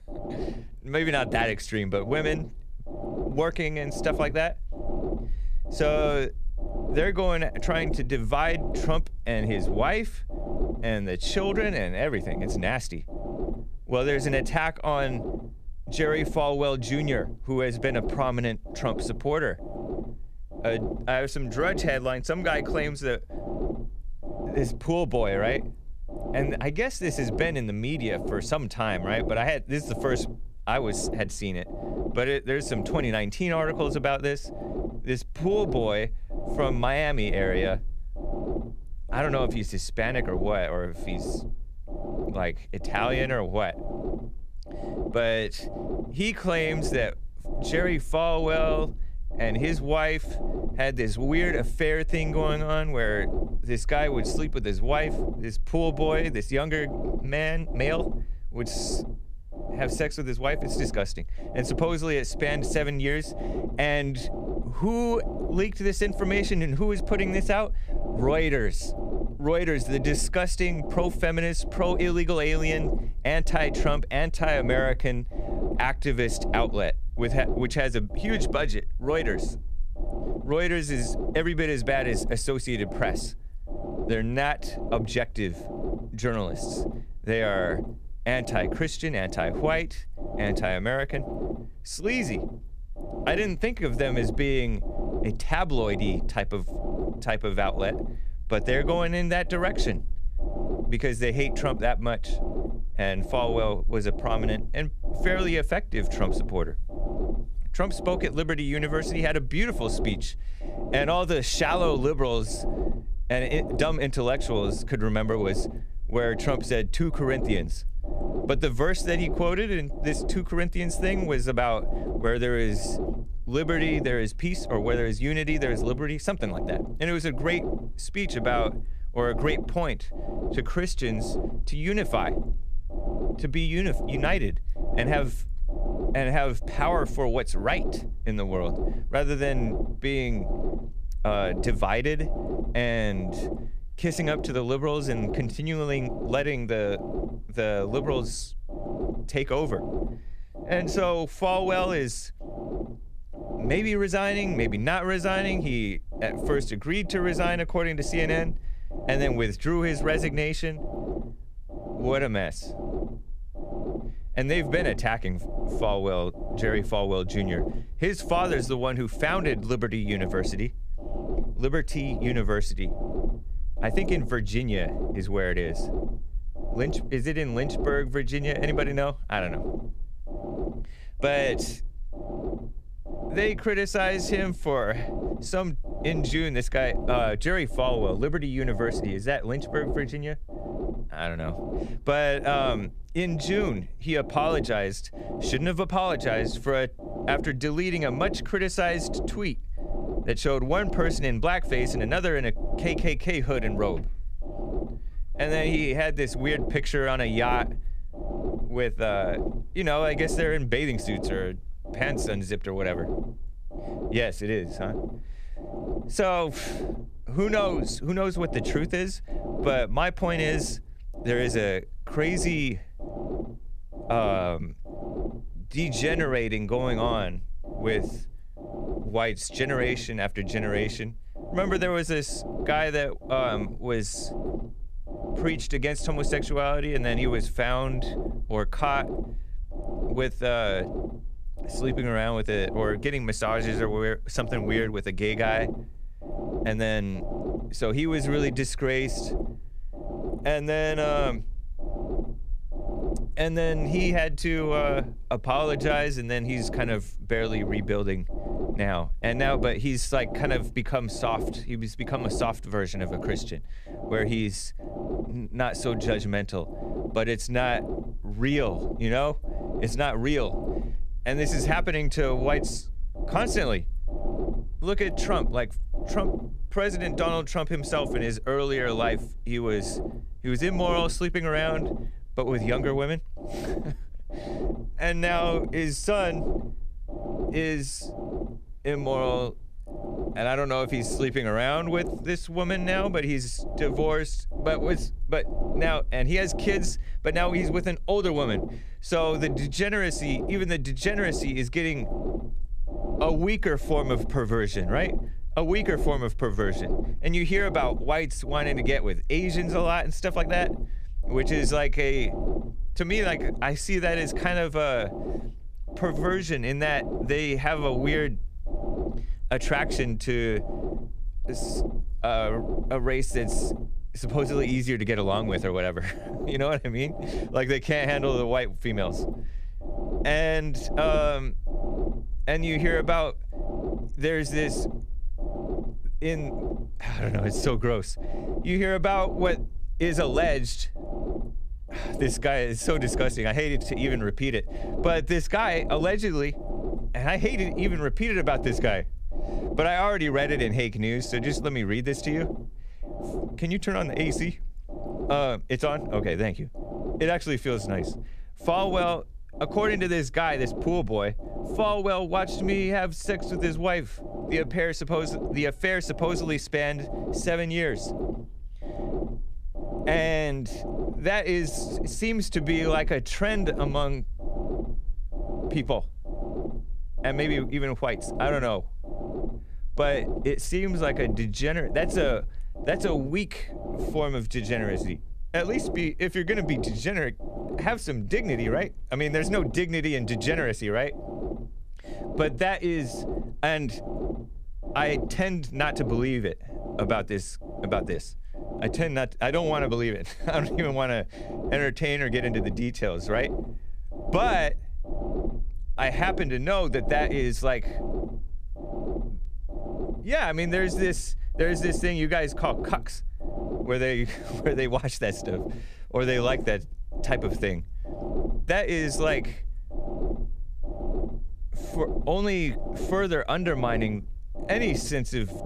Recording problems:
low rumble; noticeable; throughout; 10 dB below the speech

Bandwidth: 14.5 kHz